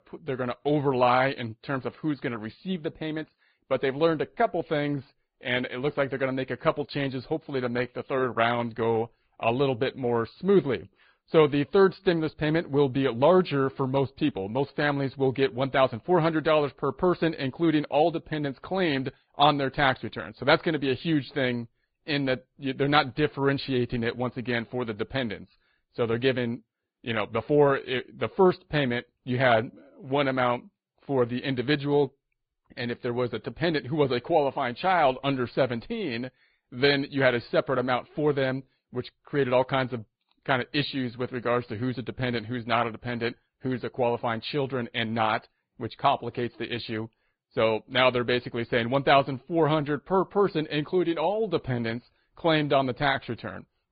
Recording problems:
high frequencies cut off; severe; nothing above 4.5 kHz
garbled, watery; slightly

